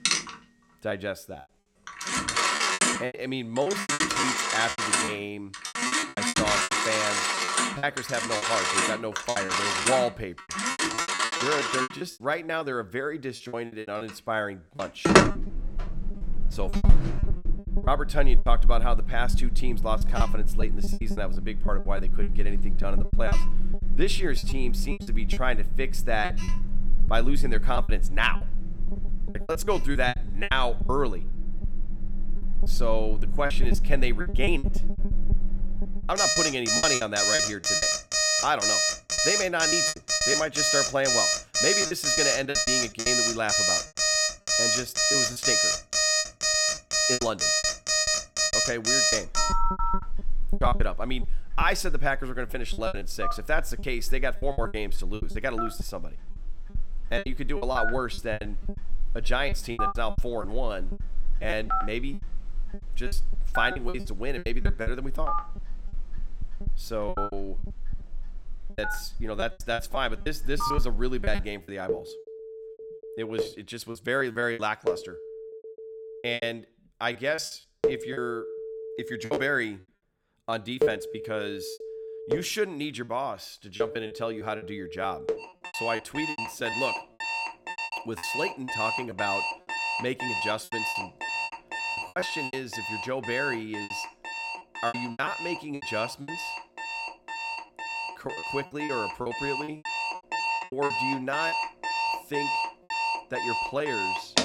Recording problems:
alarms or sirens; very loud; throughout; 4 dB above the speech
choppy; very; 14% of the speech affected

